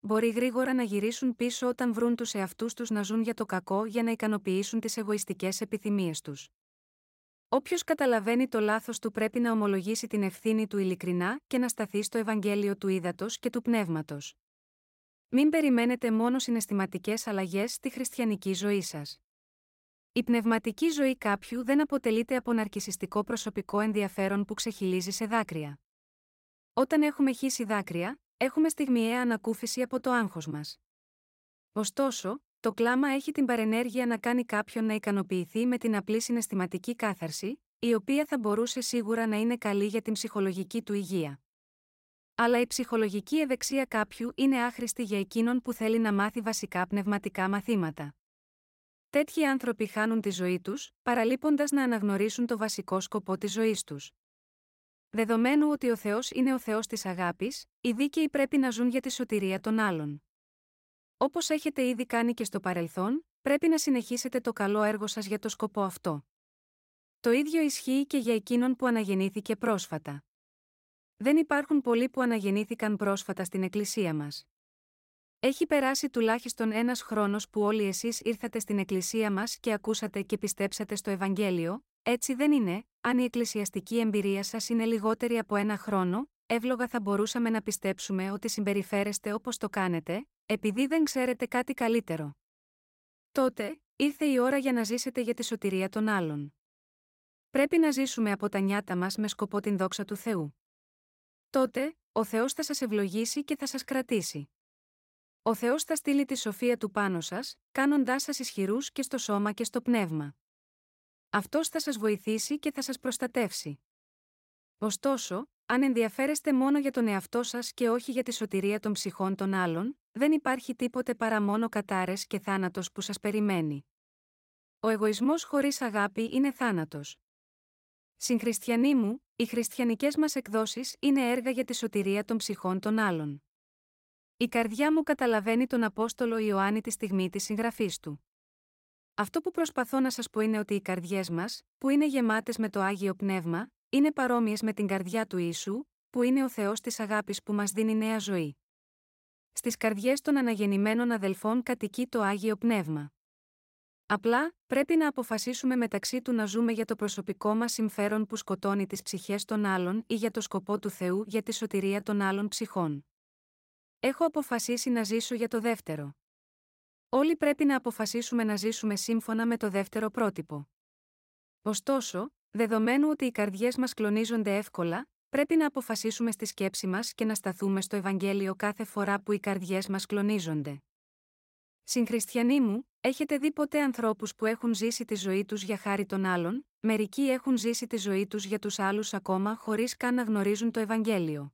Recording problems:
none

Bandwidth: 16 kHz